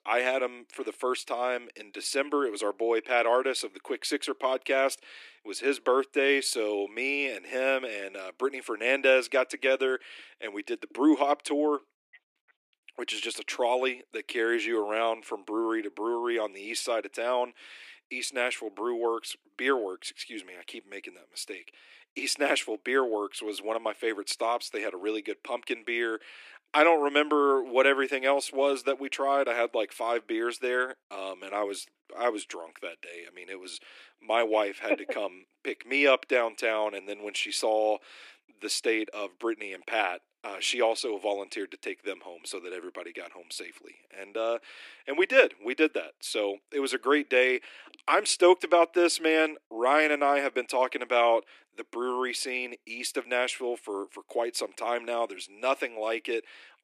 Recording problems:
thin; somewhat; fading below 300 Hz

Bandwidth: 15 kHz